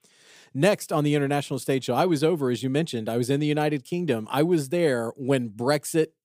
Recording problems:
none

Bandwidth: 15.5 kHz